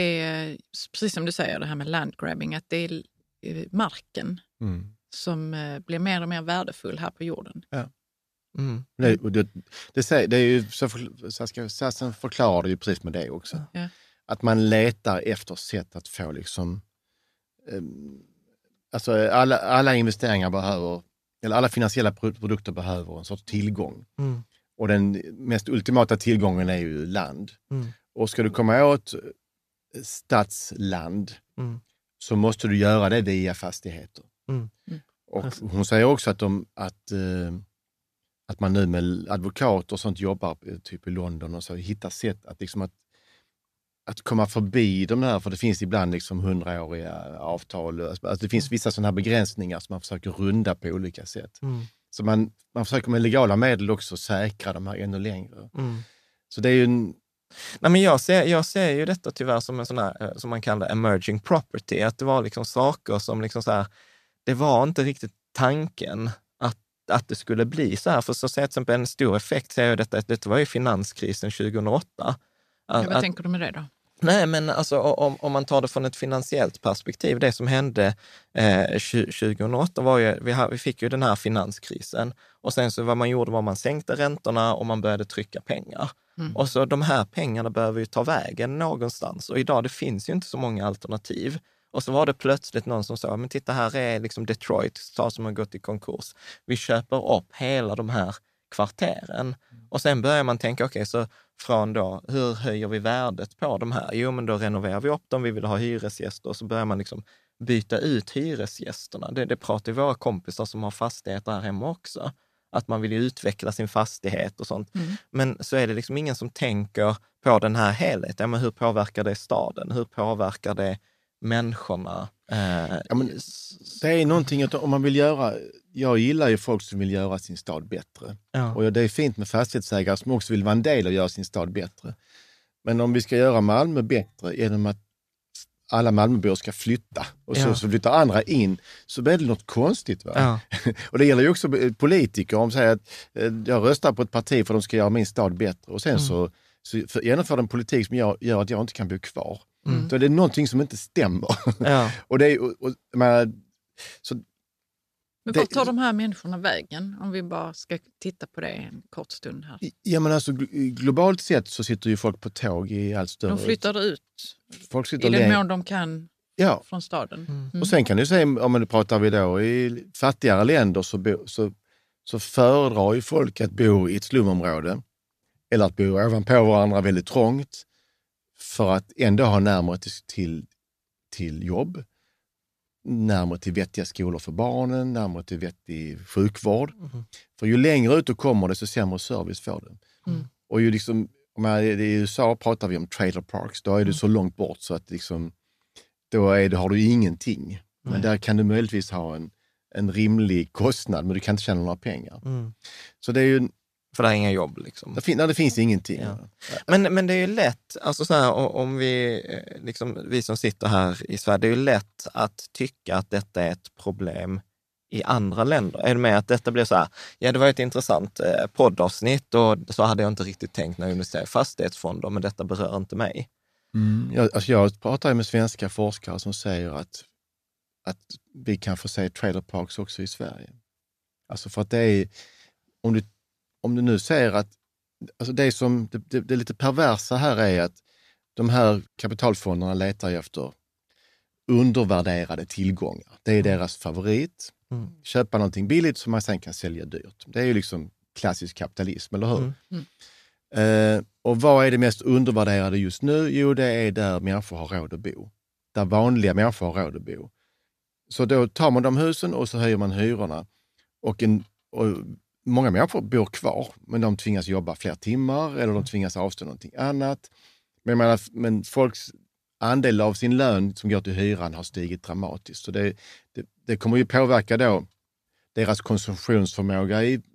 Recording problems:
abrupt cut into speech; at the start

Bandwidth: 14.5 kHz